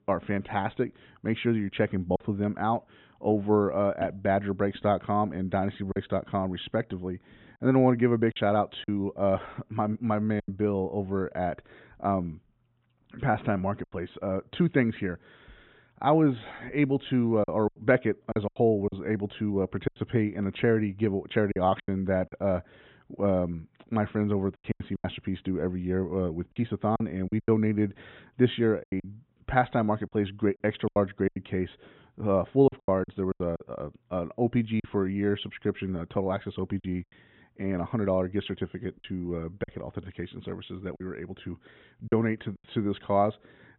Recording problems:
high frequencies cut off; severe; nothing above 4 kHz
choppy; very; 6% of the speech affected

